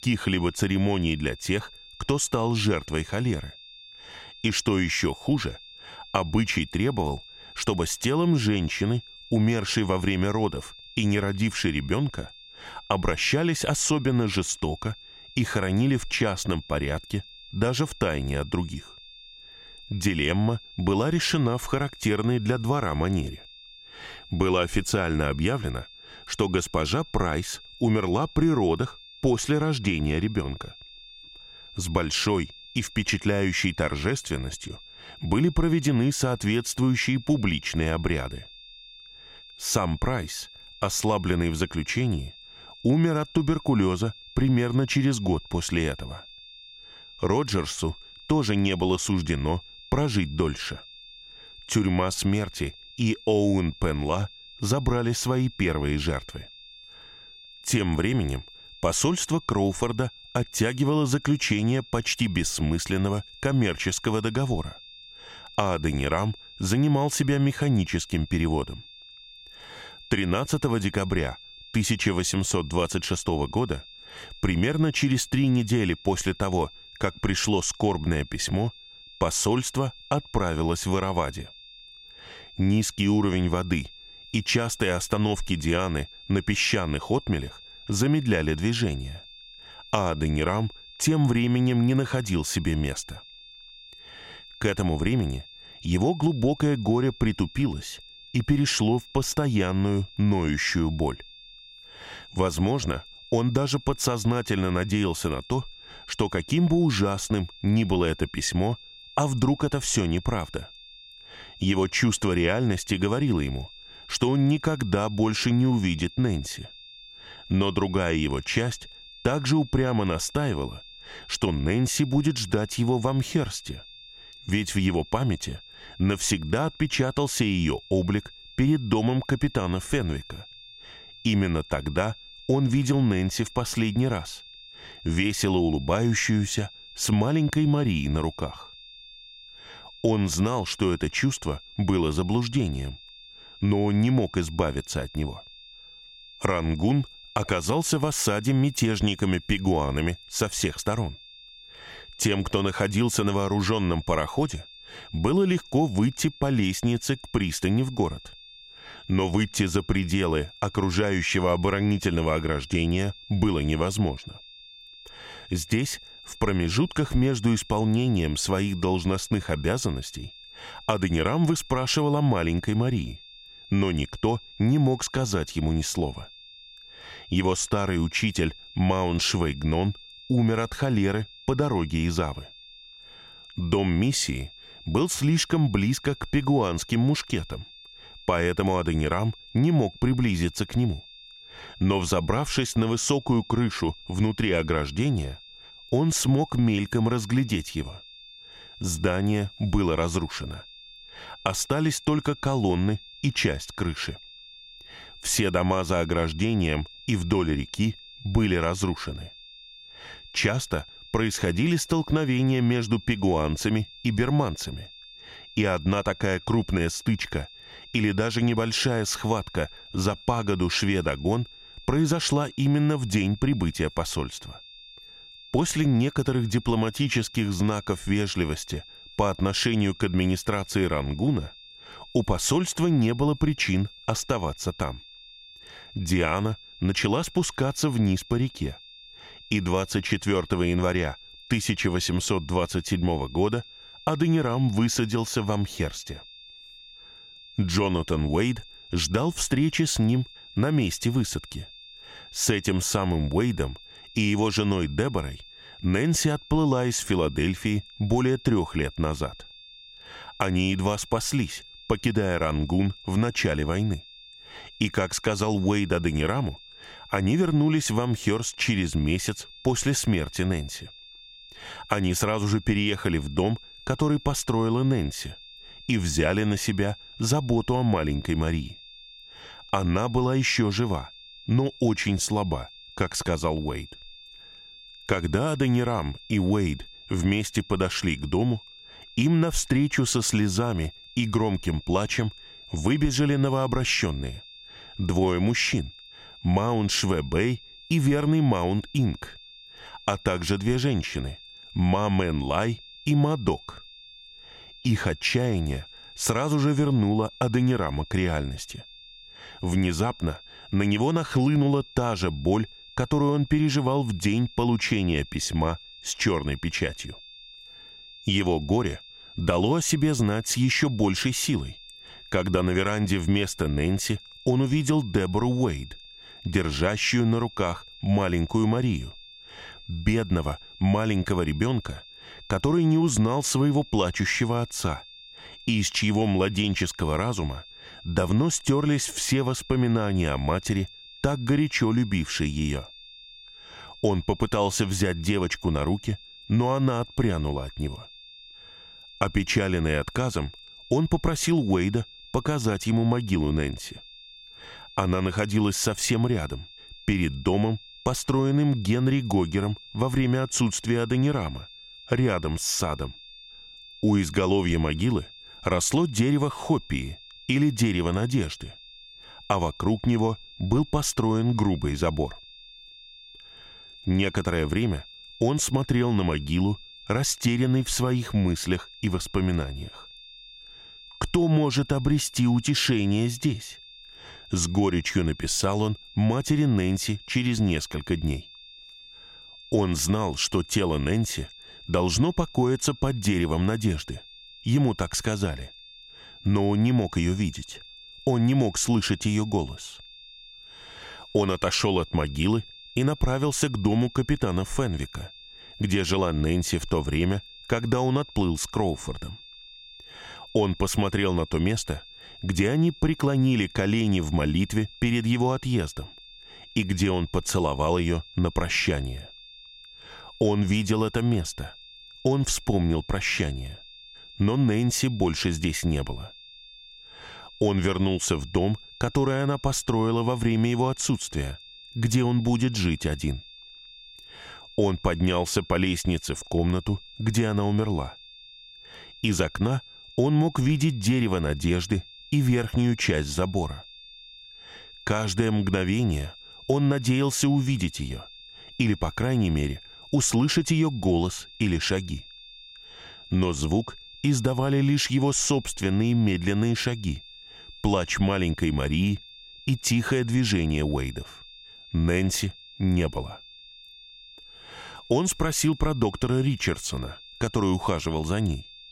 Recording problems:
high-pitched whine; noticeable; throughout; 3.5 kHz, 20 dB below the speech

